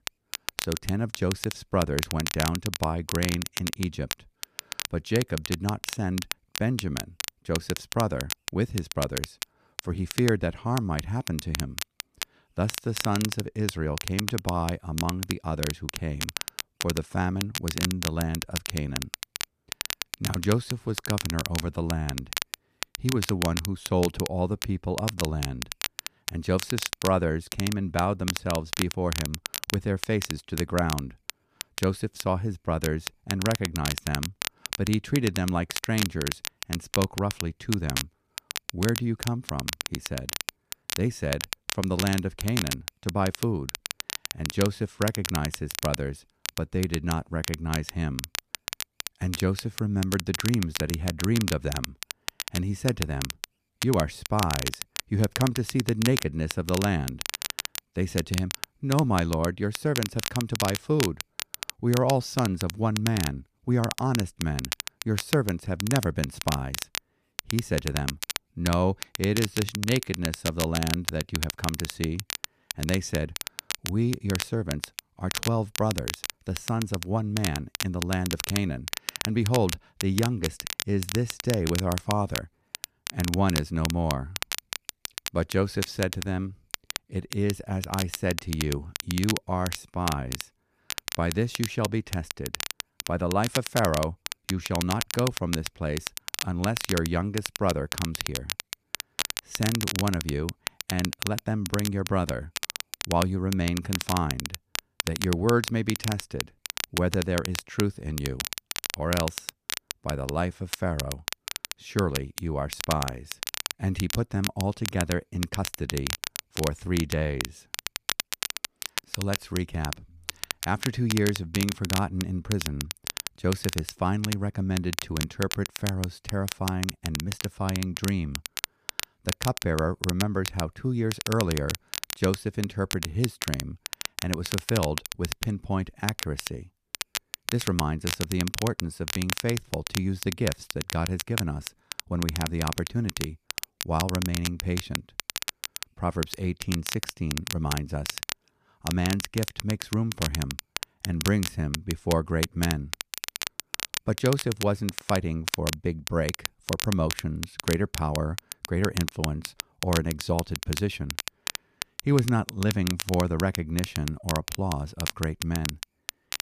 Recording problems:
crackle, like an old record; loud; 5 dB below the speech

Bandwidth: 14.5 kHz